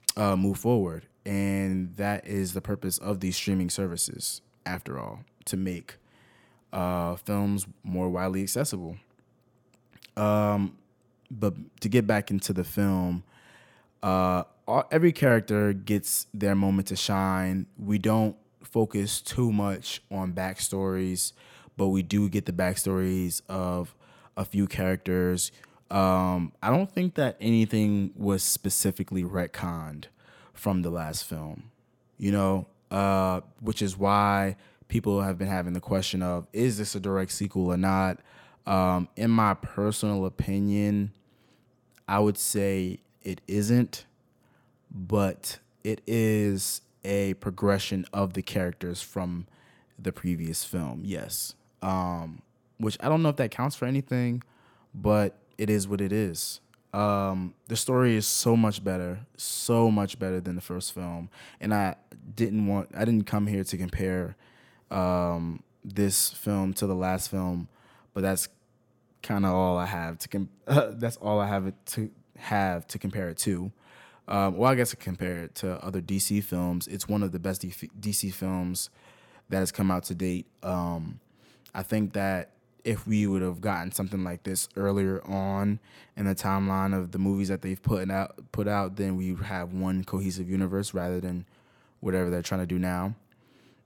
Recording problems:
none

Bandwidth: 17.5 kHz